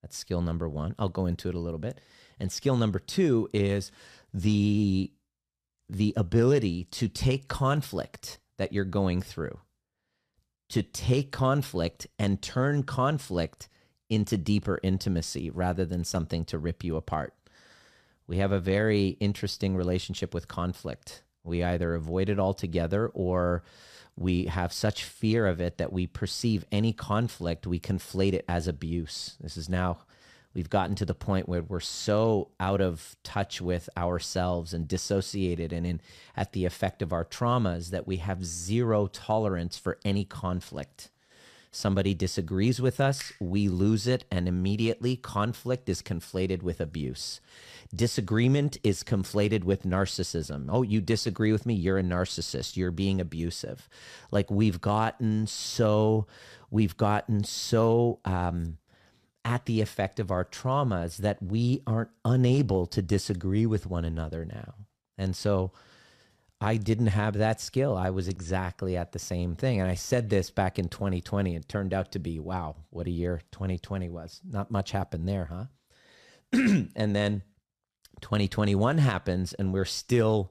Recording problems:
none

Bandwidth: 14.5 kHz